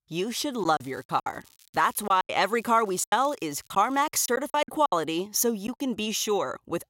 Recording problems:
crackling; faint; from 0.5 to 2 s and from 2.5 to 4 s; 30 dB below the speech
choppy; very; from 0.5 to 2.5 s and from 3 to 6 s; 14% of the speech affected

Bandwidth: 16 kHz